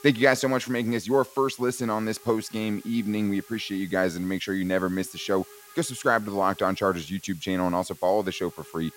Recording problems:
hiss; faint; throughout; 20 dB below the speech

